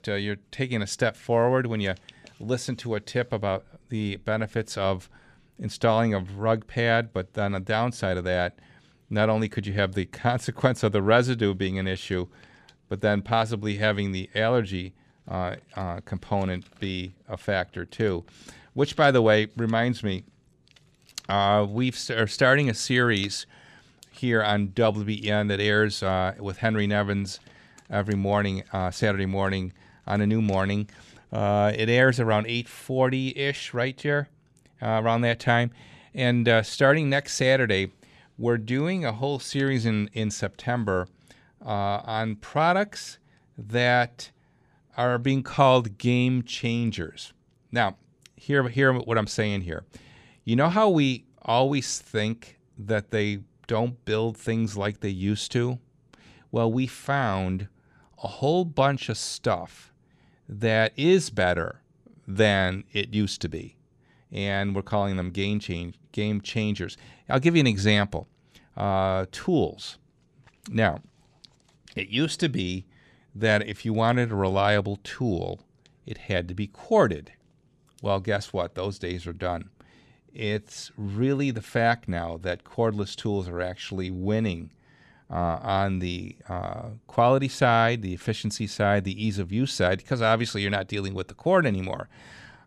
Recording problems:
none

